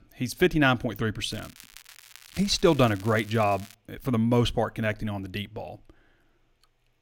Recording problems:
crackling; faint; from 1.5 to 3.5 s; 20 dB below the speech

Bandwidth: 16.5 kHz